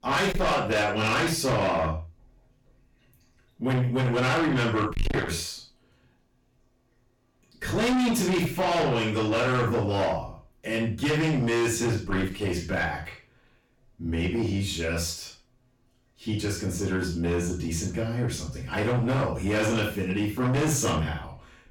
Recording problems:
distortion; heavy; 6 dB below the speech
off-mic speech; far
room echo; noticeable; dies away in 0.3 s

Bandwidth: 18.5 kHz